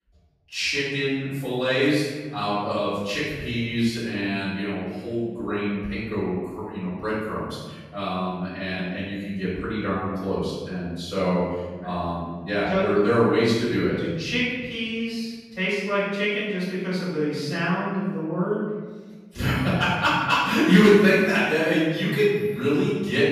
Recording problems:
room echo; strong; dies away in 1.4 s
off-mic speech; far

